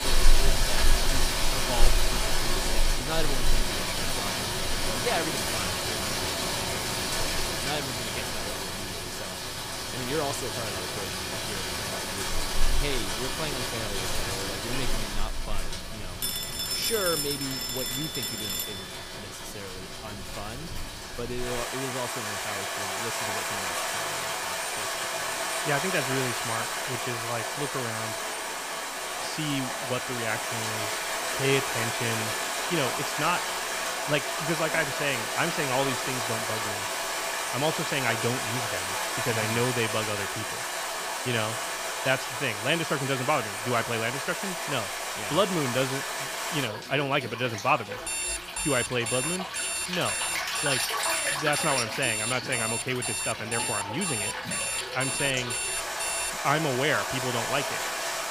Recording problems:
rain or running water; very loud; throughout; 2 dB above the speech
phone ringing; loud; from 16 to 19 s; peak 5 dB above the speech
footsteps; noticeable; from 28 to 37 s; peak 8 dB below the speech
alarm; loud; from 48 to 56 s; peak 3 dB above the speech

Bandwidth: 15 kHz